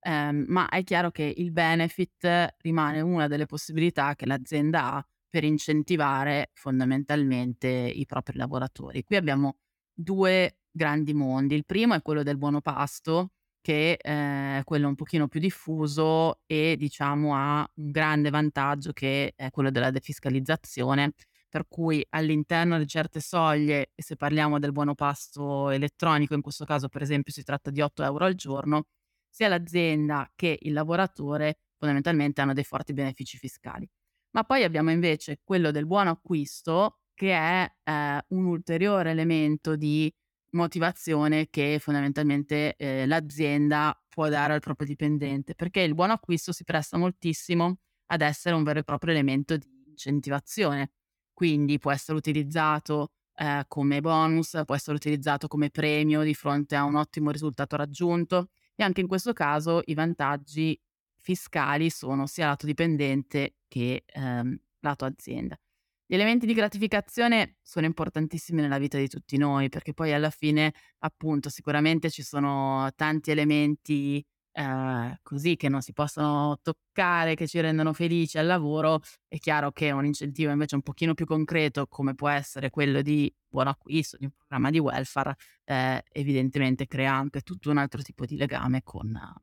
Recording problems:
none

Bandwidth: 17.5 kHz